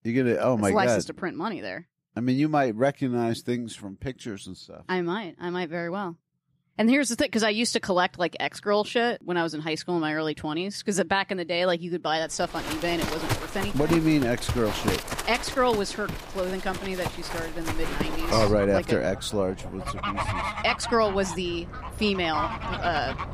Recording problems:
animal sounds; loud; from 13 s on; 6 dB below the speech

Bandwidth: 14.5 kHz